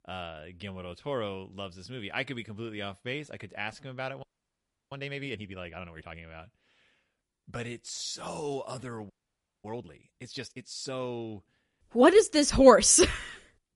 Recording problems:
garbled, watery; slightly; nothing above 10.5 kHz
audio freezing; at 4 s for 0.5 s and at 9 s for 0.5 s

